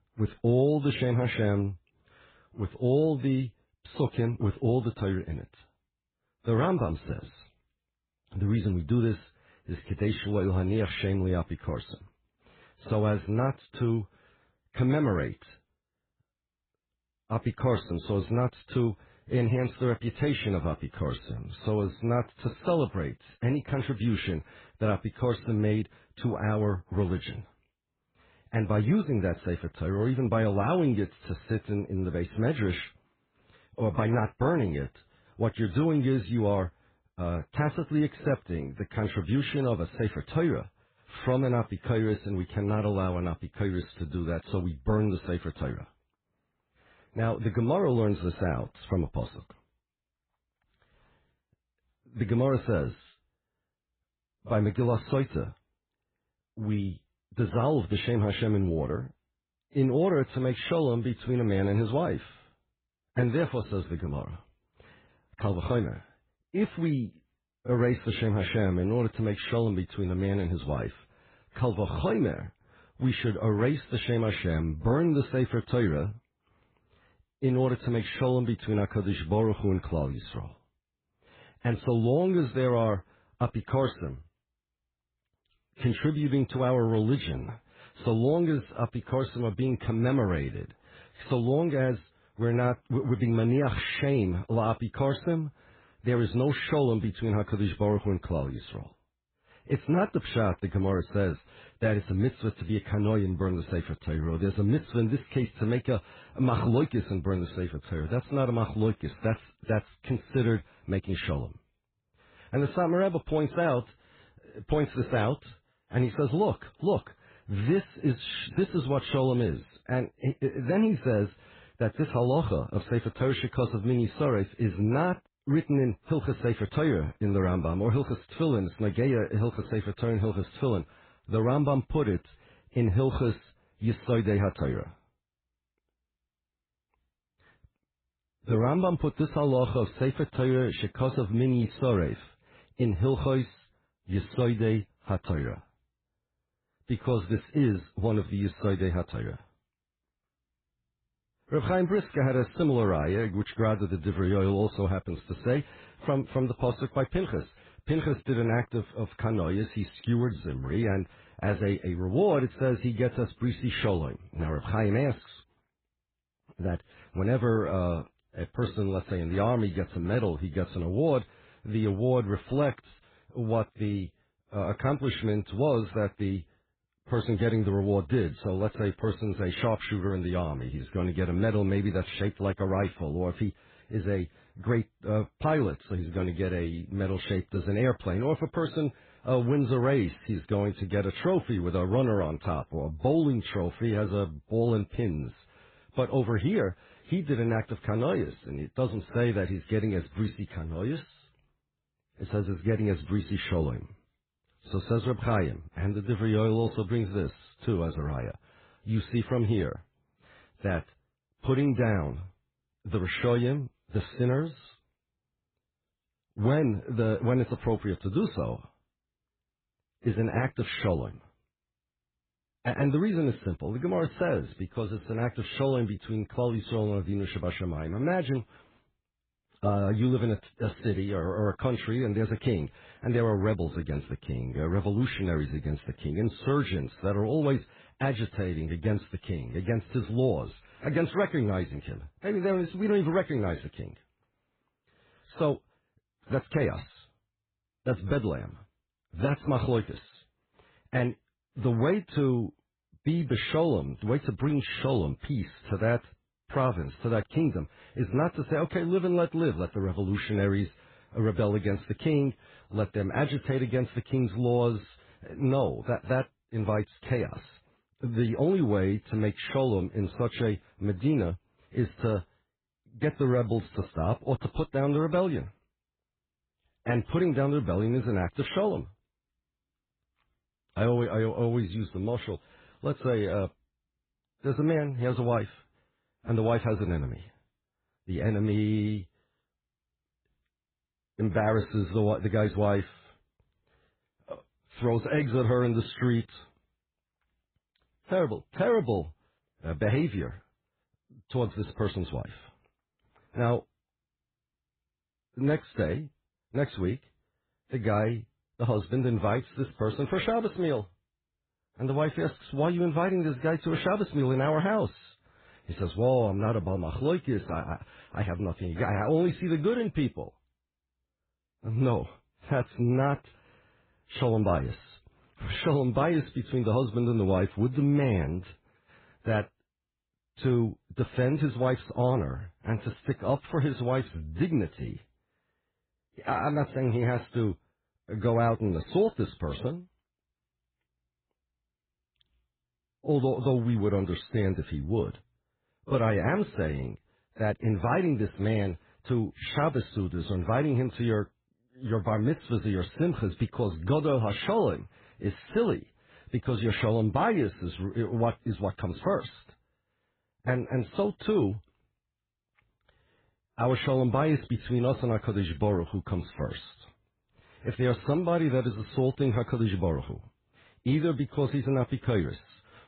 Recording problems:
garbled, watery; badly
high frequencies cut off; severe; nothing above 4 kHz

